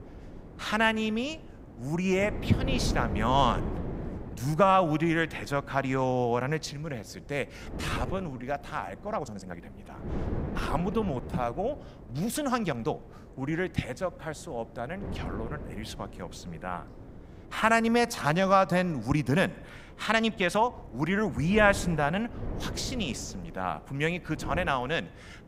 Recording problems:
wind noise on the microphone; occasional gusts; 15 dB below the speech
uneven, jittery; strongly; from 4.5 to 21 s

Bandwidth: 15.5 kHz